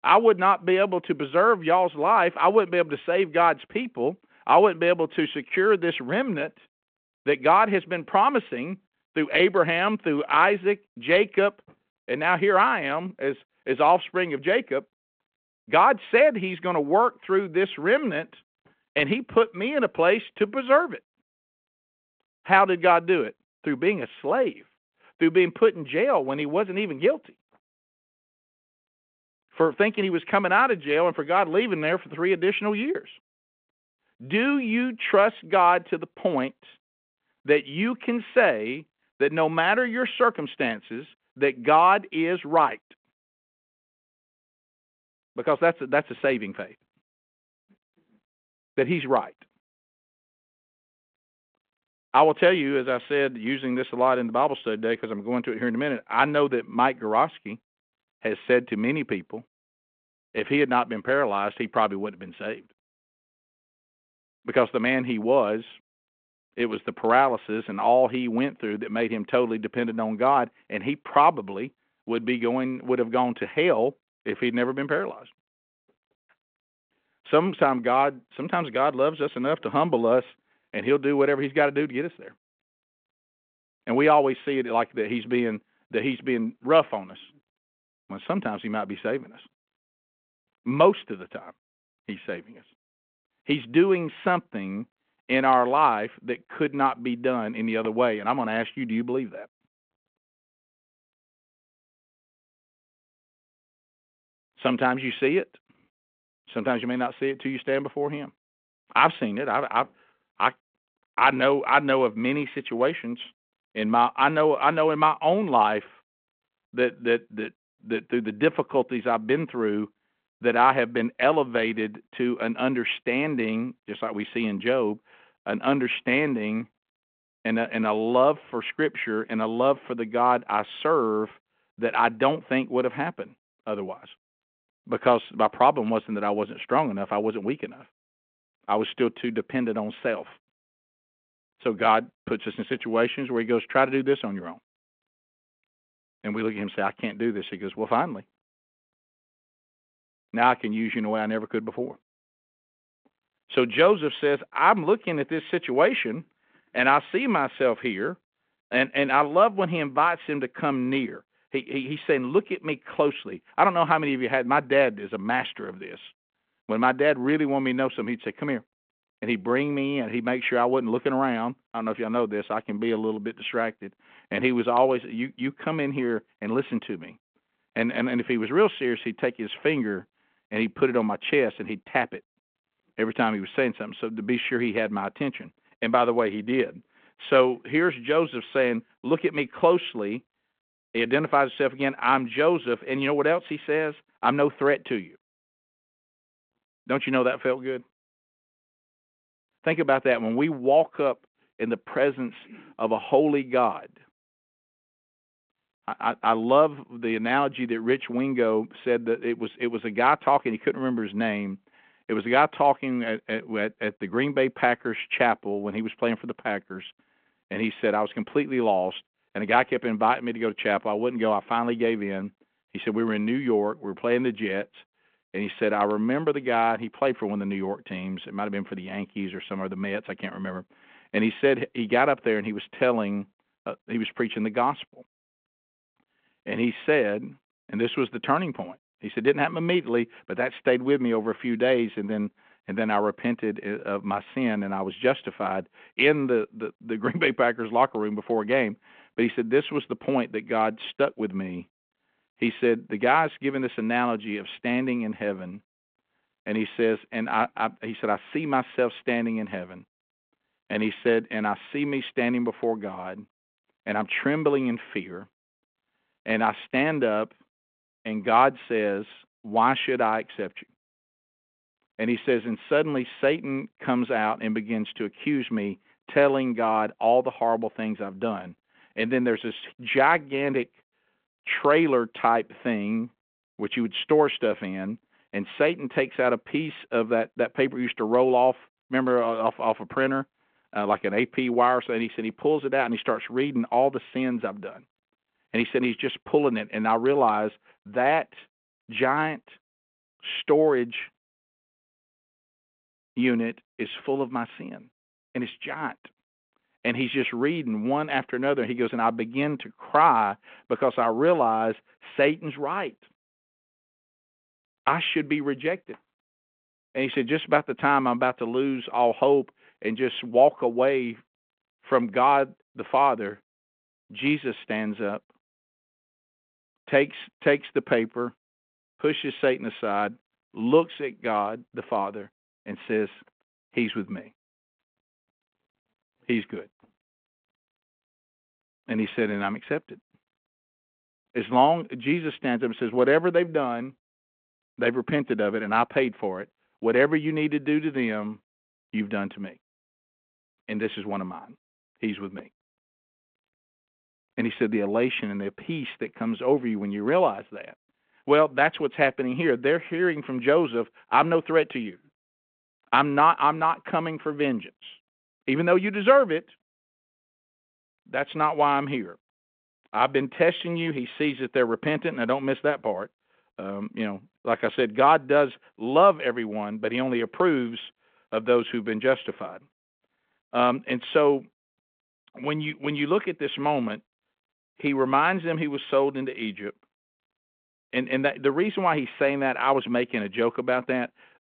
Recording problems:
phone-call audio

